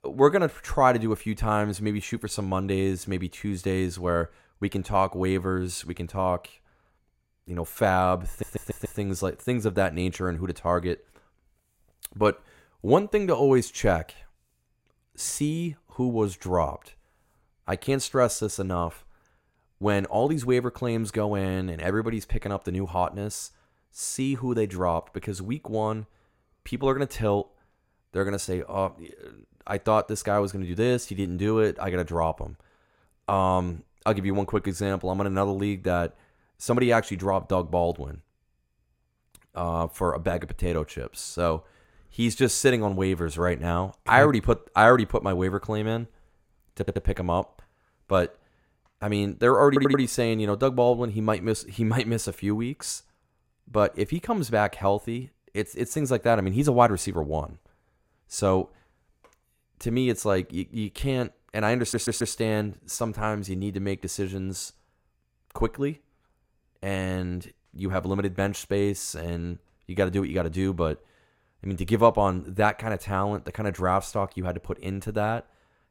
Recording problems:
audio stuttering; 4 times, first at 8.5 s

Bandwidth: 16 kHz